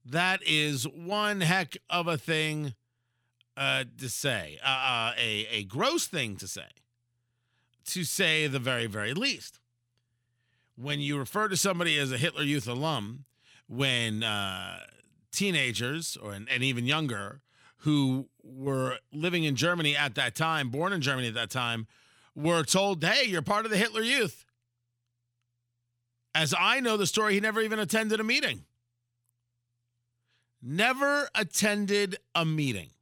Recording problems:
none

